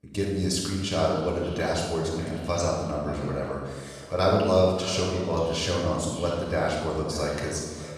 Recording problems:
room echo; strong; dies away in 1 s
off-mic speech; far
echo of what is said; noticeable; throughout; 580 ms later, 15 dB below the speech

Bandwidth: 14 kHz